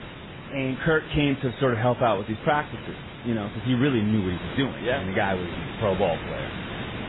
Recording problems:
garbled, watery; badly; nothing above 3.5 kHz
hiss; noticeable; throughout; 10 dB below the speech

